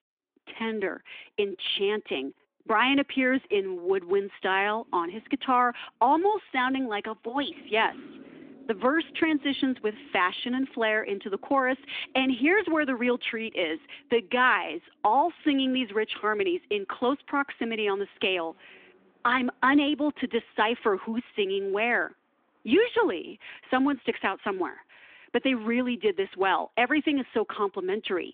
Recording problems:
phone-call audio
traffic noise; faint; throughout; 25 dB below the speech

